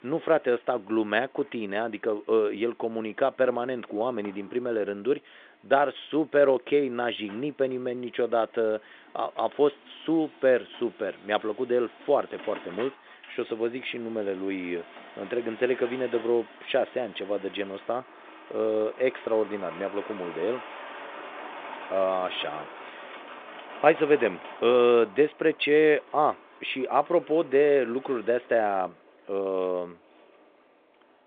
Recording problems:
phone-call audio; nothing above 3.5 kHz
traffic noise; noticeable; throughout; 20 dB below the speech

